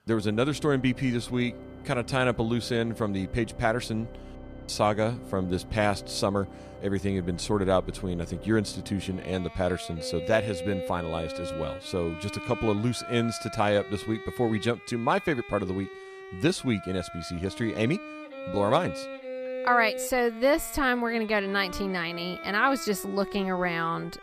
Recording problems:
background music; noticeable; throughout; 10 dB below the speech

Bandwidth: 15 kHz